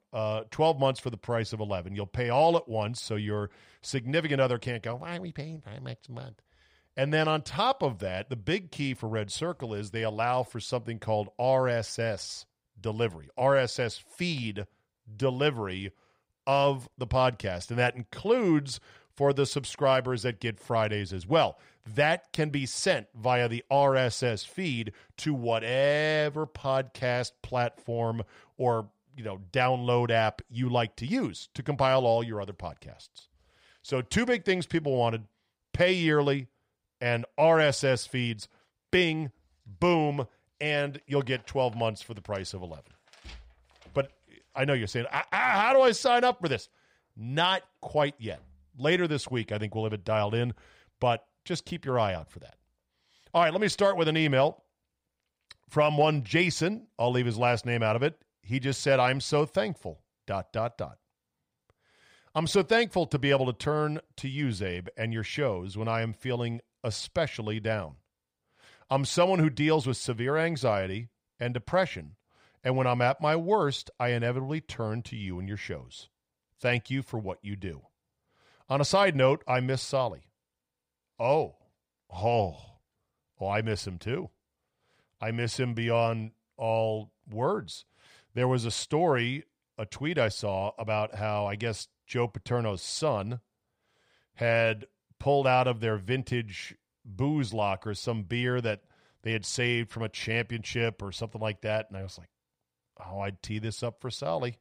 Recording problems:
none

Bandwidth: 15.5 kHz